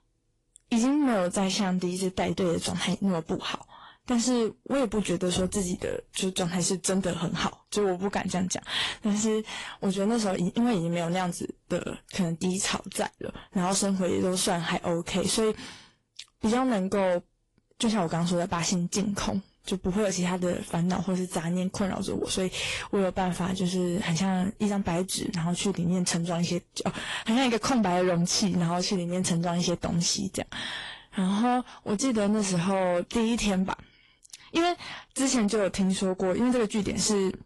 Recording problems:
distortion; slight; 10 dB below the speech
garbled, watery; slightly; nothing above 11.5 kHz

